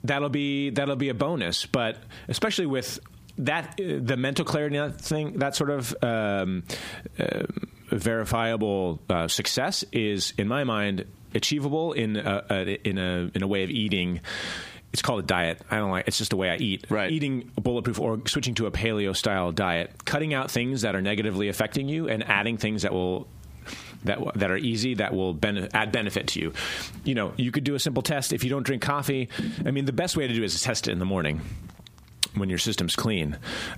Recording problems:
squashed, flat; heavily

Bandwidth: 15 kHz